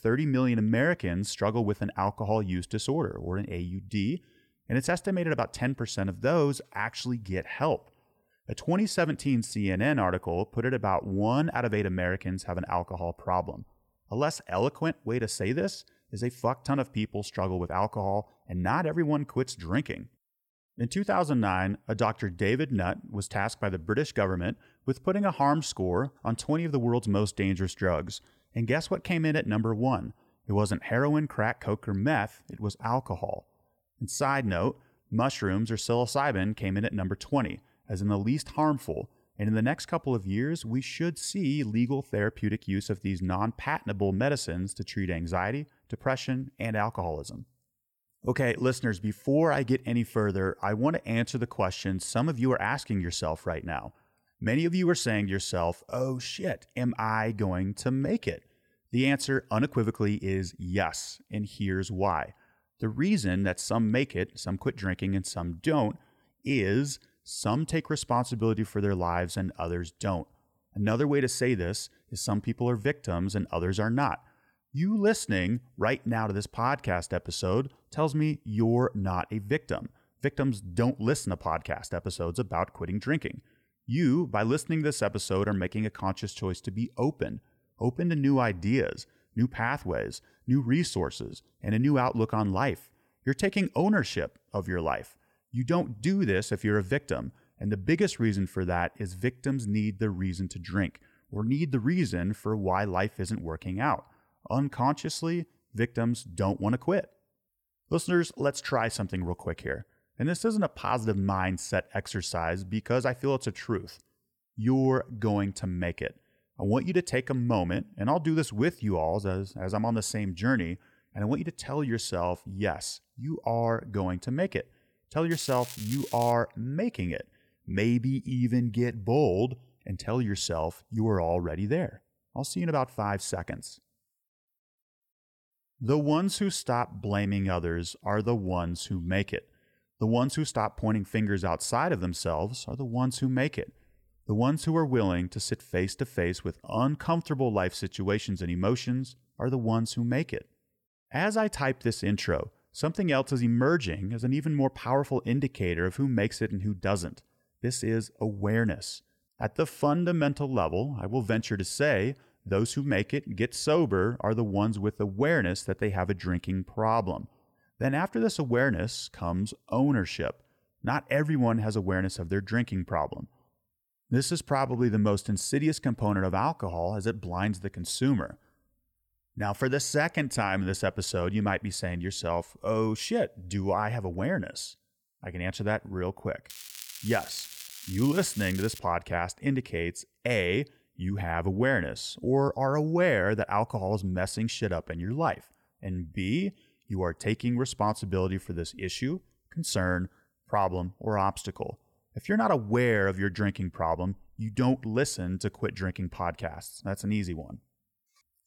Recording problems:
crackling; noticeable; from 2:05 to 2:06 and from 3:06 to 3:09; 10 dB below the speech

